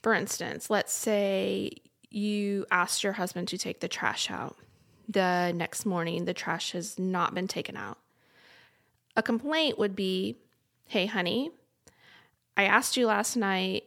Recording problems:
none

